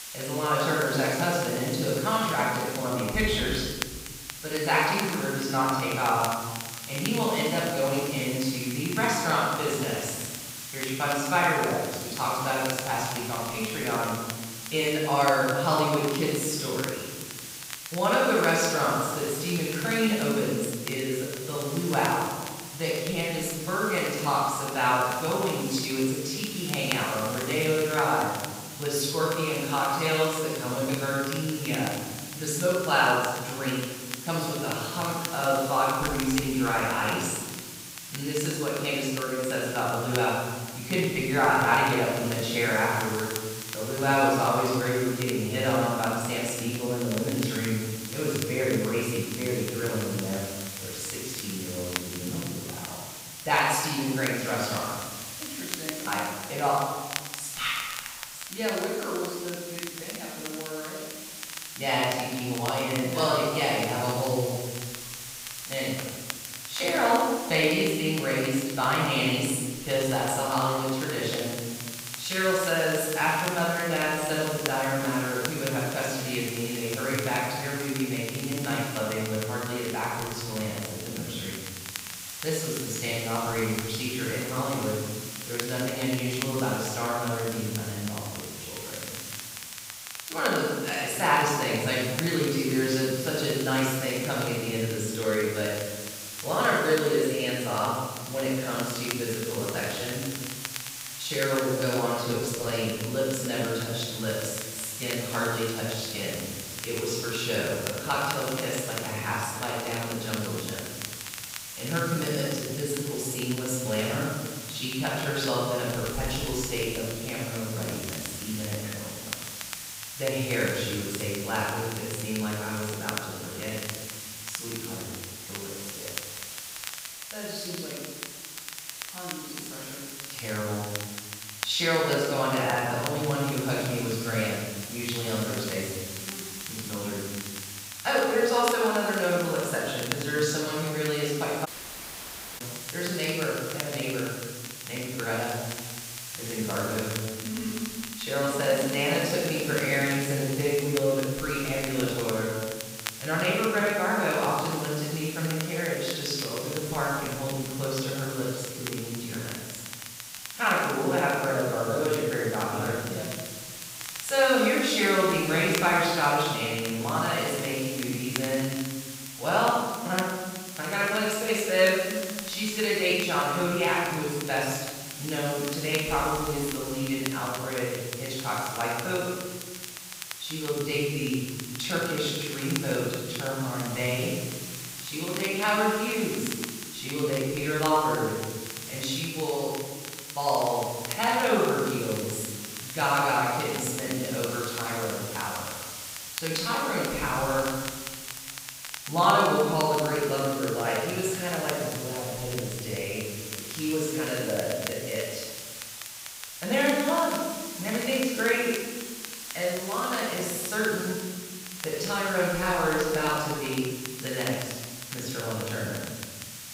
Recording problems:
room echo; strong; dies away in 1.5 s
off-mic speech; far
hiss; loud; throughout; 9 dB below the speech
crackle, like an old record; noticeable; 15 dB below the speech
audio cutting out; at 2:22 for 1 s

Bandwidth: 15.5 kHz